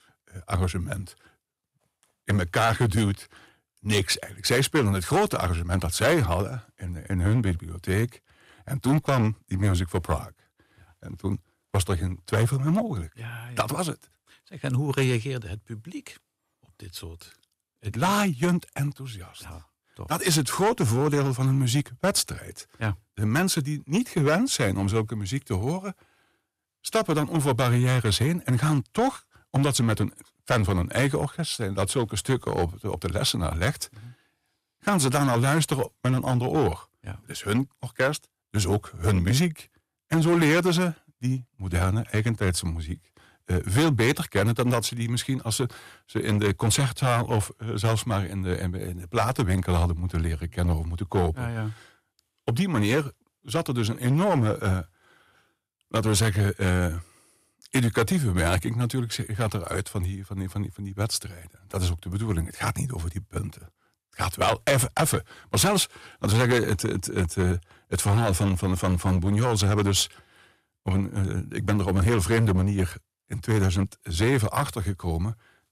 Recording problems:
distortion; slight; 5% of the sound clipped

